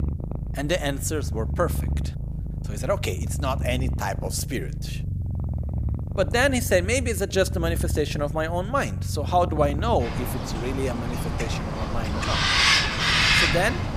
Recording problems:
animal sounds; very loud; throughout; 1 dB above the speech

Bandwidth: 15 kHz